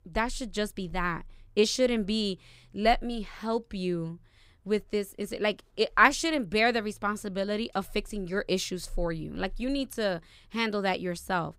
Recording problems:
none

